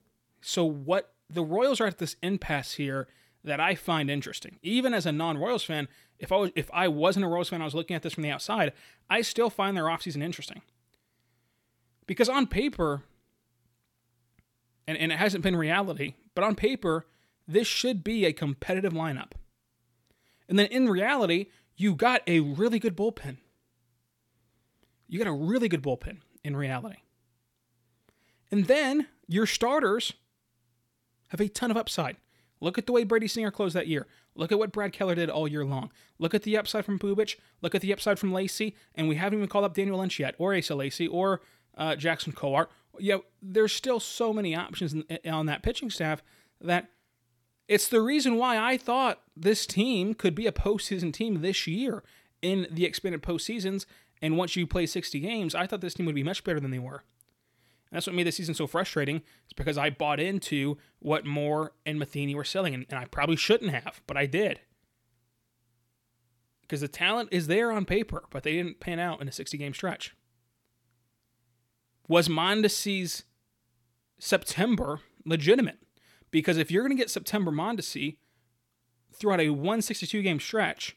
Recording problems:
none

